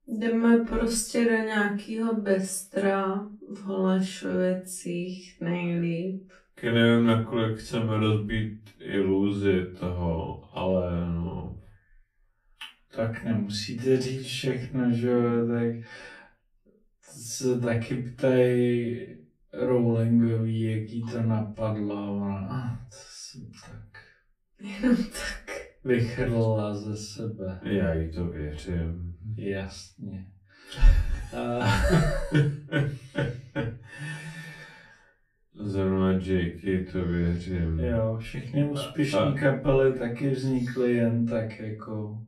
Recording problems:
off-mic speech; far
wrong speed, natural pitch; too slow; 0.5 times normal speed
room echo; very slight; dies away in 0.3 s

